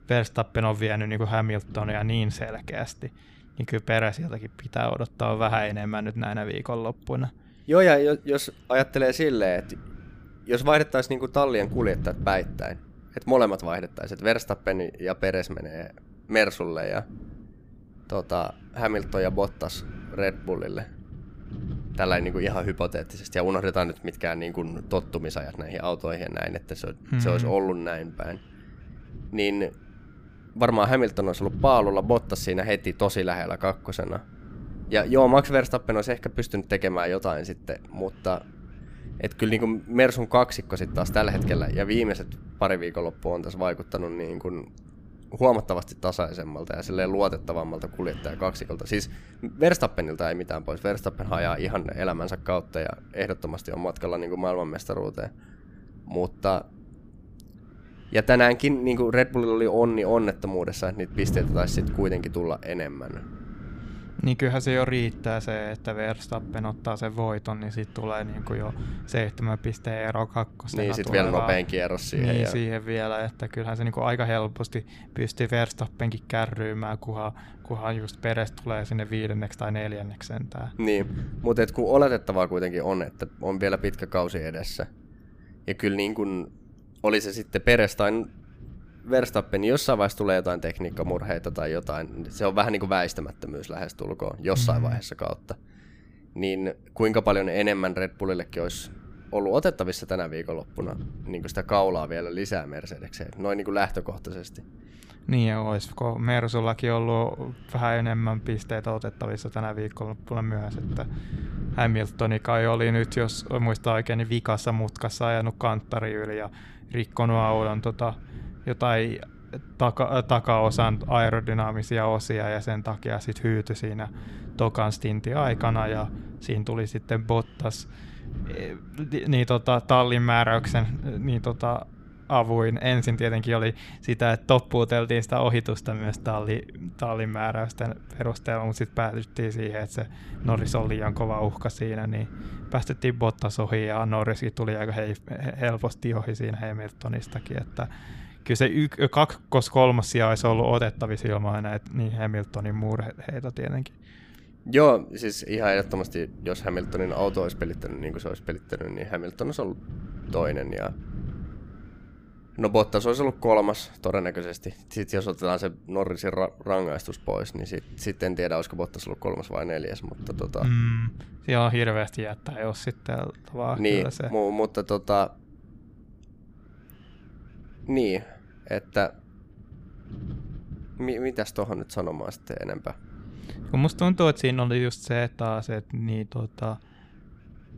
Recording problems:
wind noise on the microphone; occasional gusts; 25 dB below the speech

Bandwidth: 15 kHz